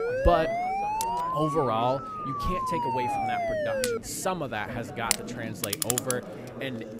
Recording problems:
household noises; very loud; throughout; as loud as the speech
background chatter; loud; throughout; 4 voices, 9 dB below the speech
siren; loud; until 4 s; peak 3 dB above the speech

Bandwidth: 15.5 kHz